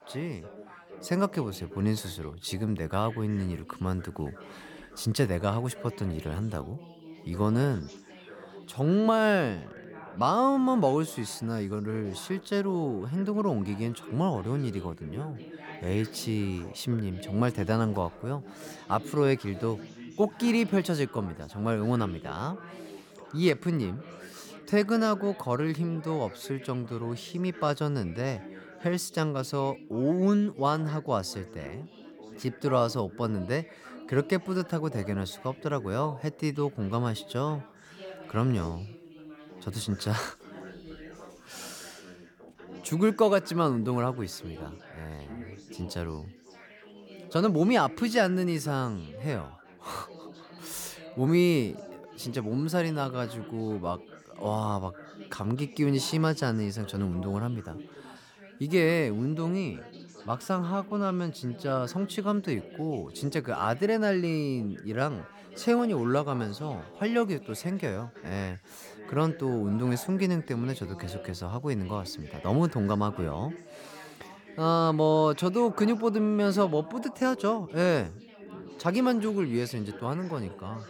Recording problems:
background chatter; noticeable; throughout; 3 voices, 15 dB below the speech

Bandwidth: 18 kHz